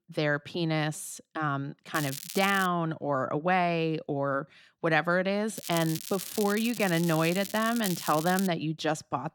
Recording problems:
crackling; loud; at 2 s and from 5.5 to 8.5 s; 9 dB below the speech

